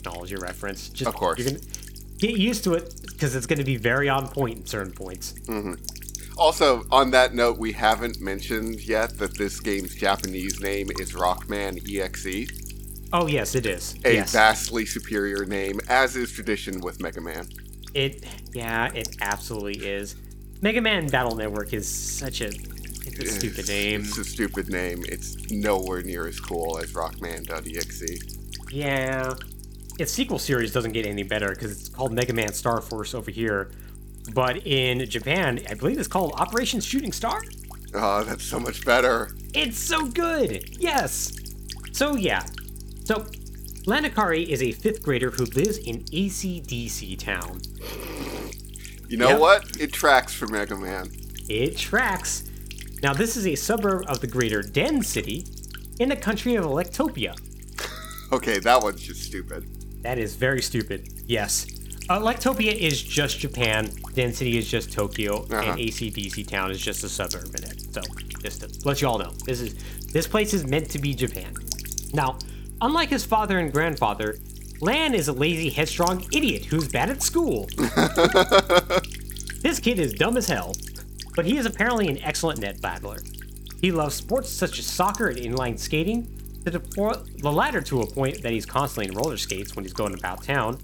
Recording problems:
electrical hum; noticeable; throughout; 50 Hz, 15 dB below the speech

